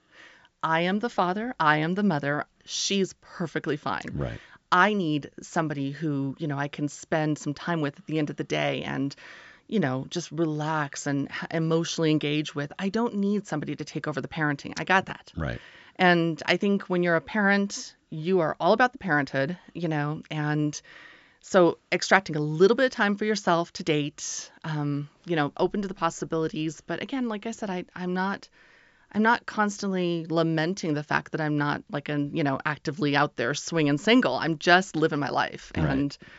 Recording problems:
high frequencies cut off; noticeable; nothing above 8 kHz

